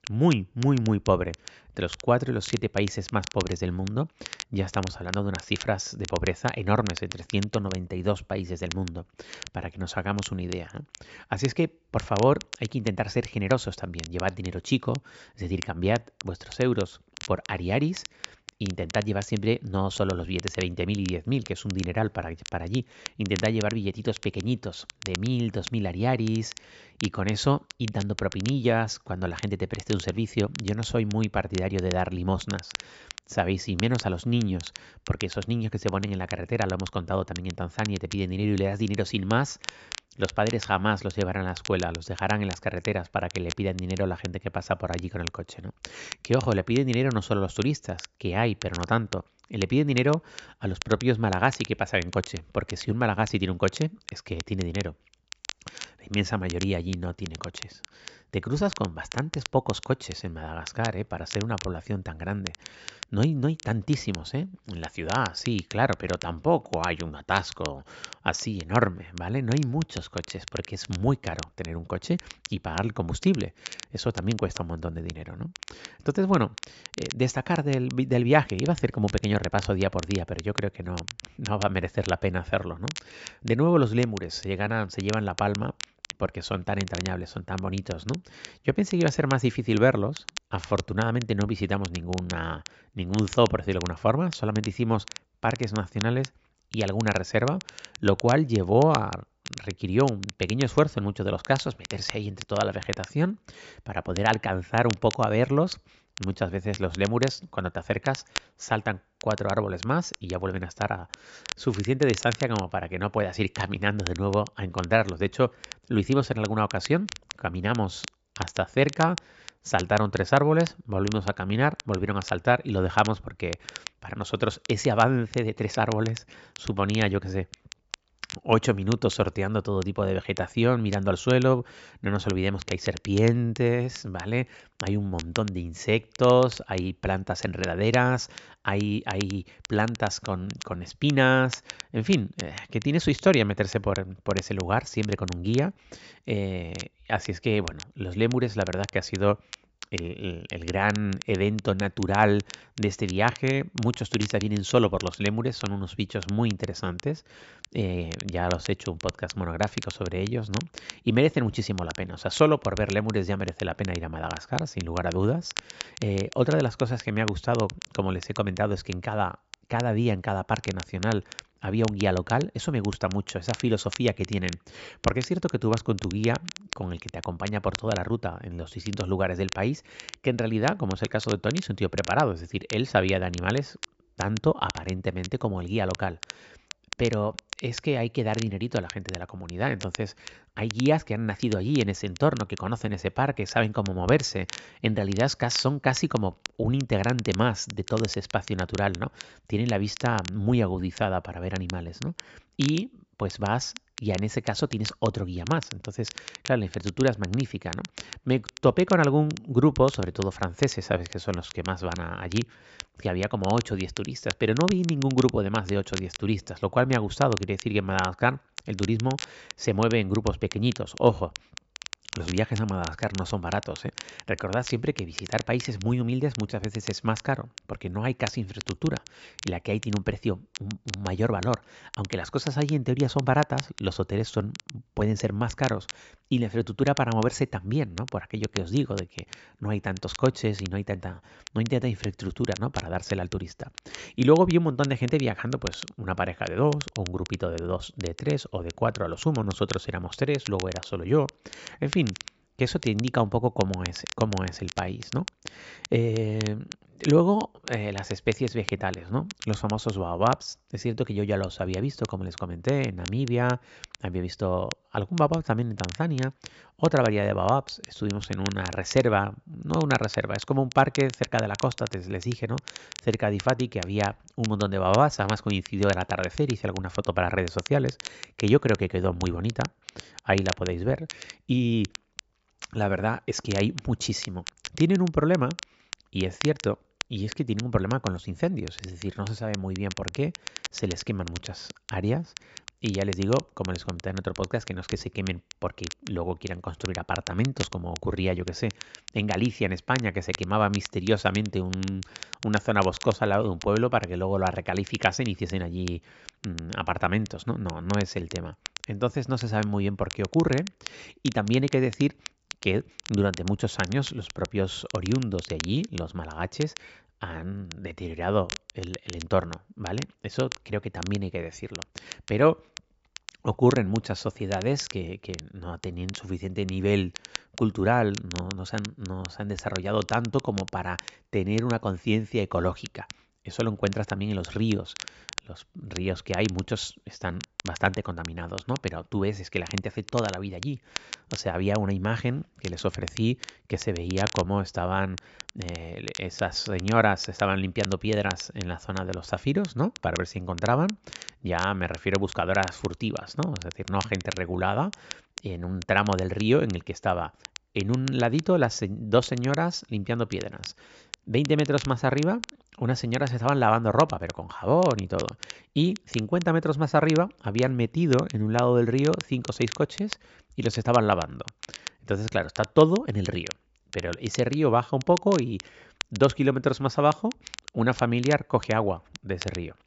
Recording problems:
high frequencies cut off; noticeable; nothing above 8 kHz
crackle, like an old record; noticeable; 15 dB below the speech

